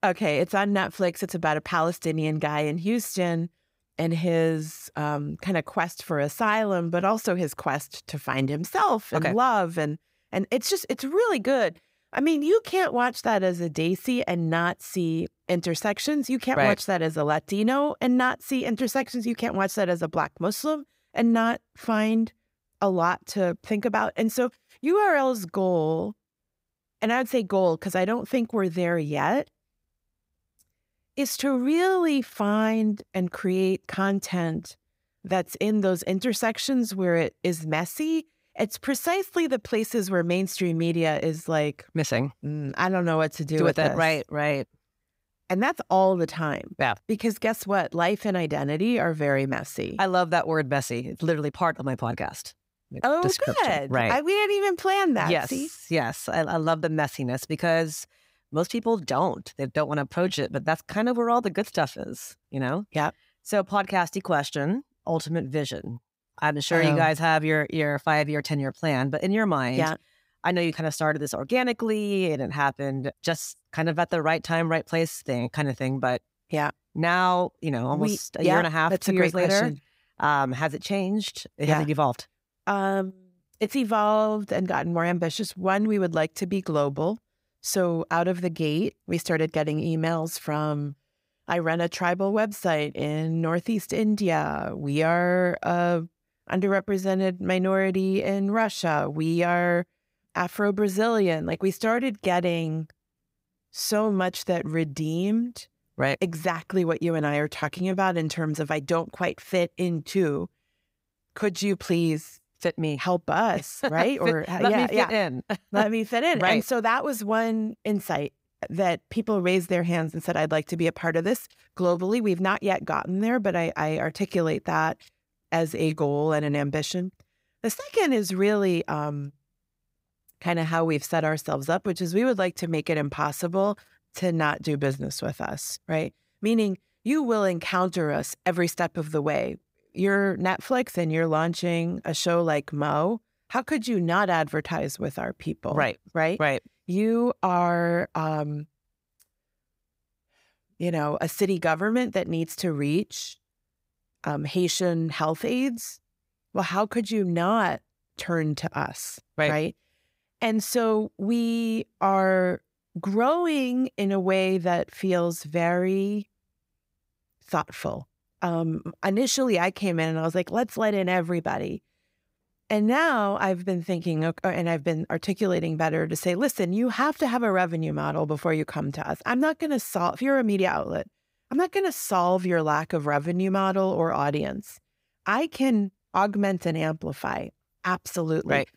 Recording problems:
none

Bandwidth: 15.5 kHz